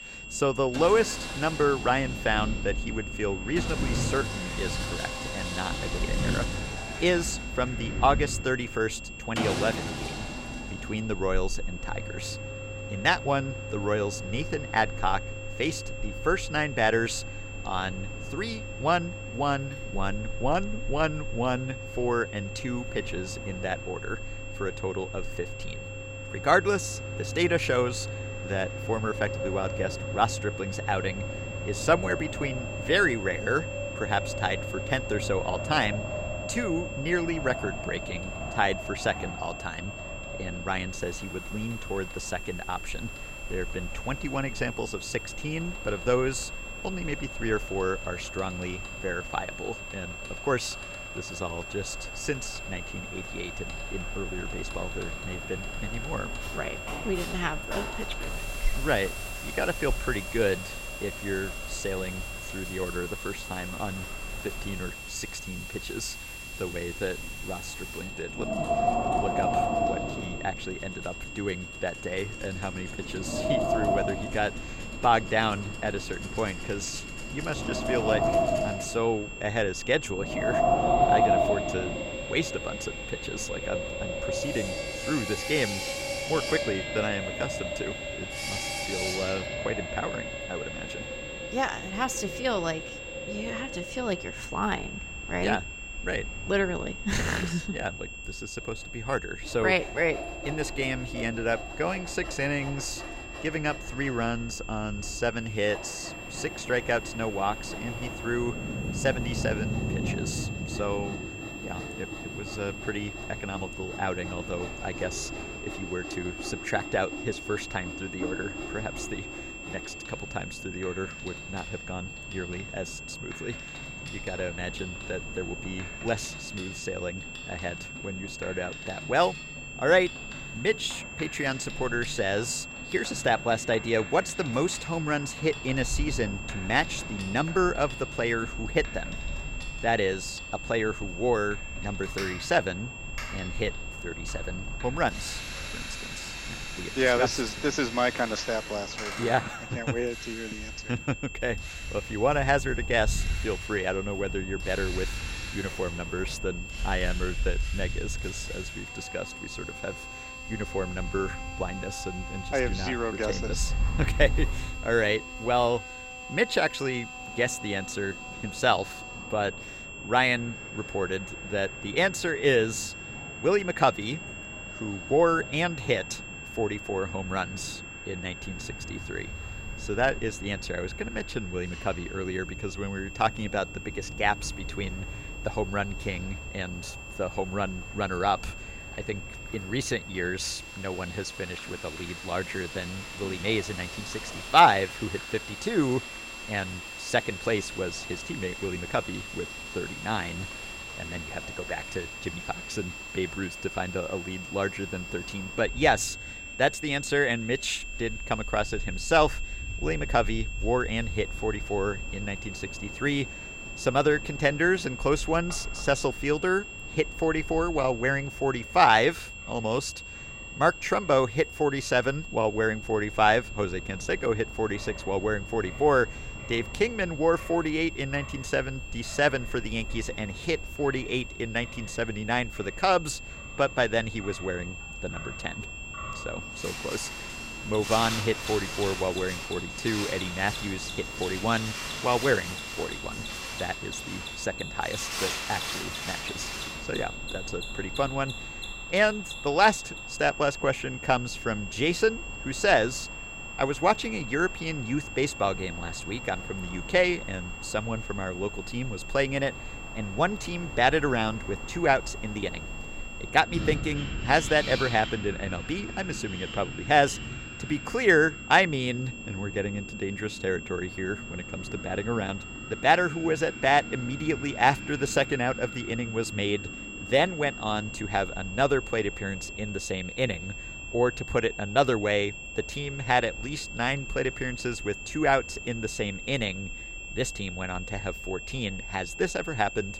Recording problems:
wind in the background; loud; throughout; 9 dB below the speech
high-pitched whine; noticeable; throughout; 2.5 kHz, 10 dB below the speech
machinery noise; noticeable; throughout; 15 dB below the speech

